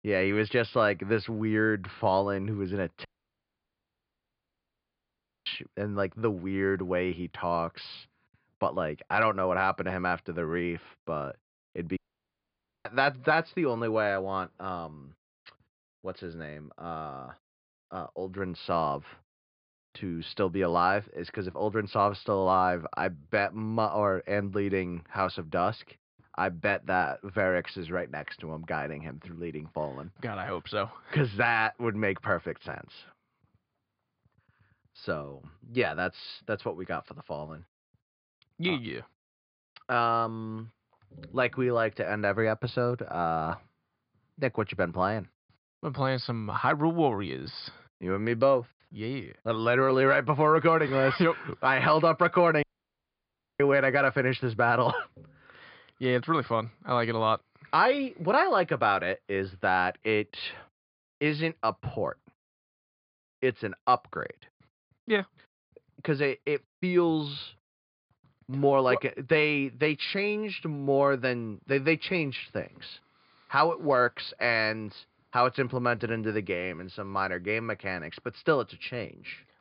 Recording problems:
high frequencies cut off; severe; nothing above 5 kHz
audio cutting out; at 3 s for 2.5 s, at 12 s for 1 s and at 53 s for 1 s

